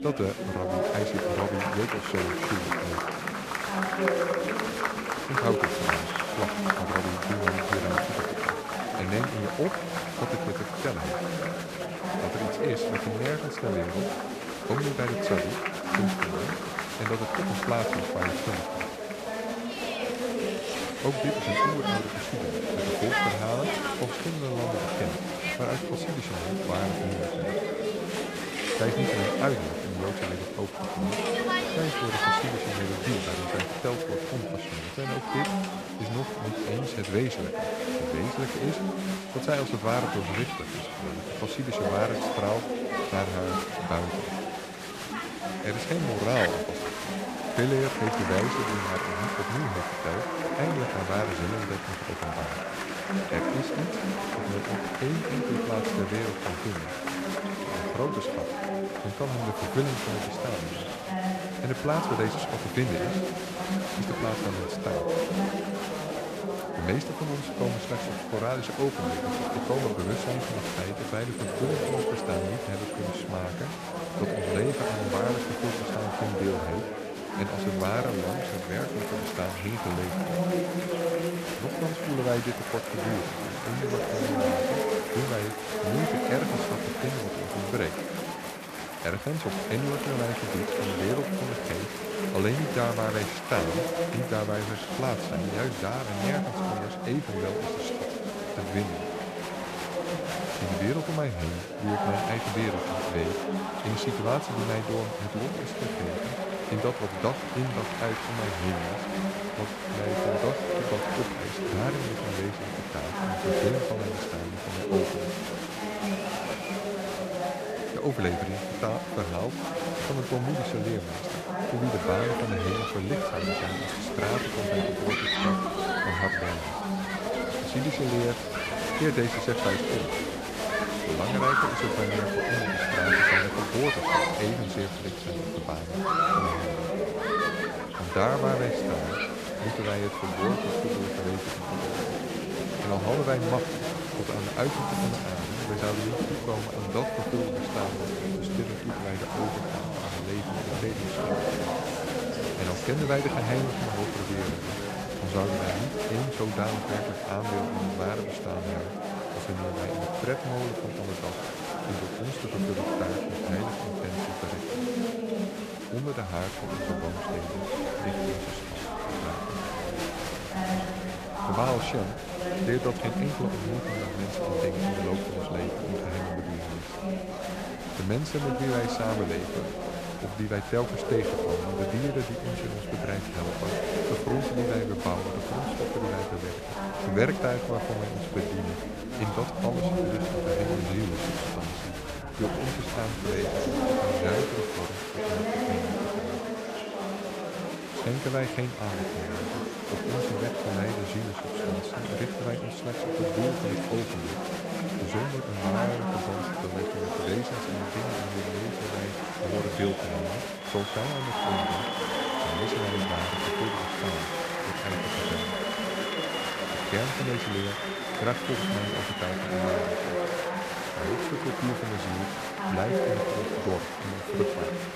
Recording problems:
chatter from many people; very loud; throughout; 3 dB above the speech

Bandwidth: 14.5 kHz